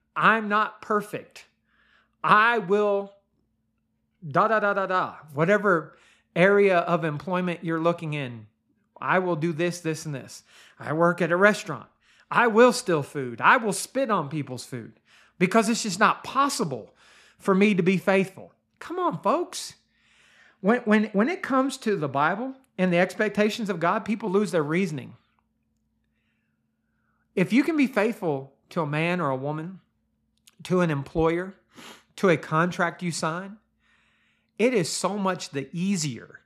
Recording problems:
none

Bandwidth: 14.5 kHz